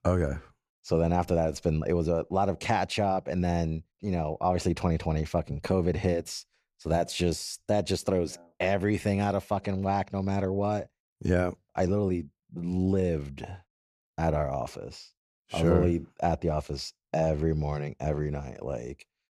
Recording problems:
none

